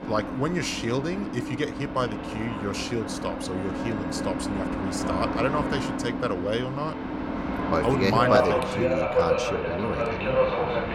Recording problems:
train or aircraft noise; very loud; throughout; as loud as the speech

